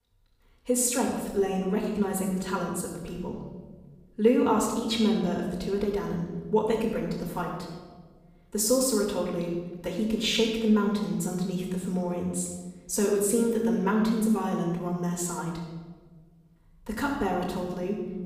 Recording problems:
off-mic speech; far
room echo; noticeable; dies away in 1.3 s

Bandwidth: 15.5 kHz